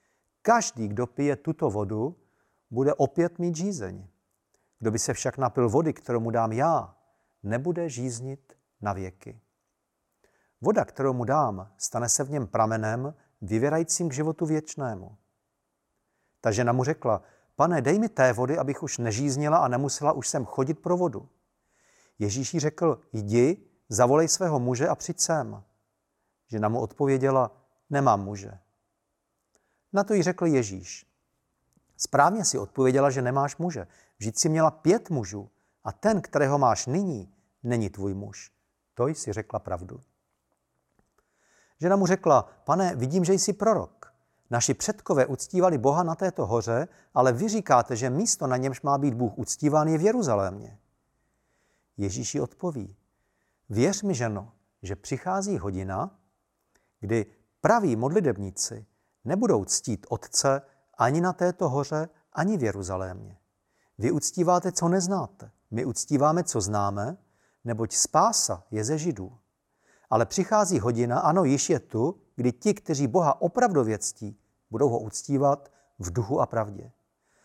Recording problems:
none

